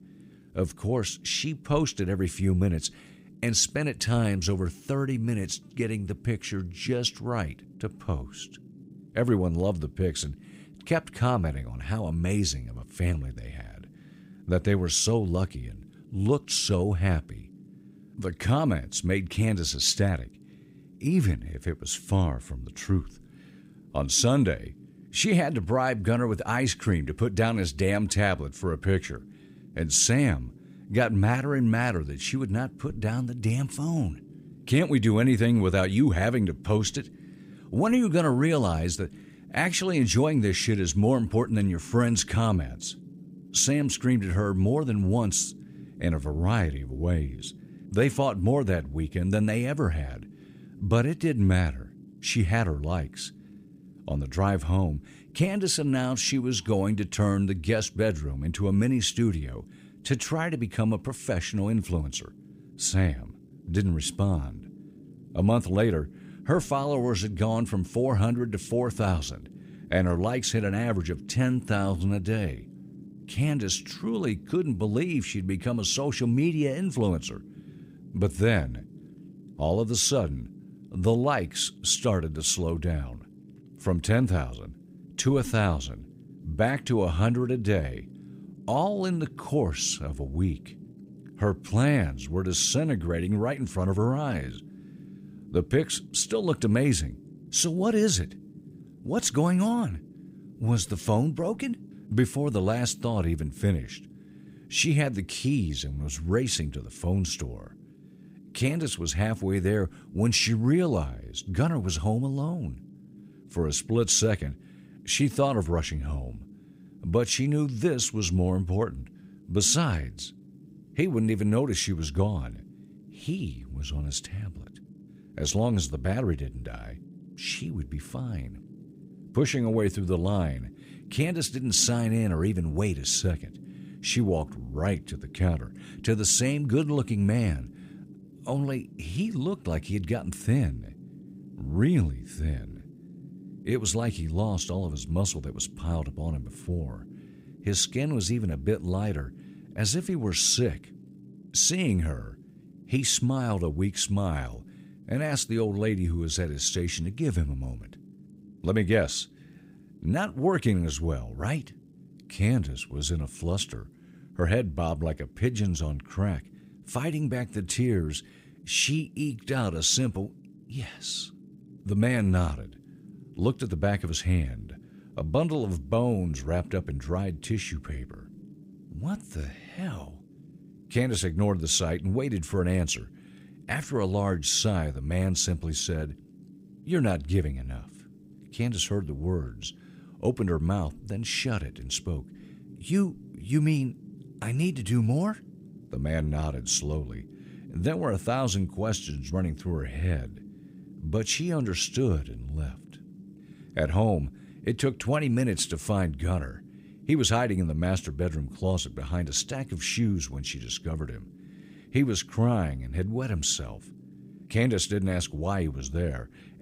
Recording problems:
low rumble; faint; throughout; 25 dB below the speech

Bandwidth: 15.5 kHz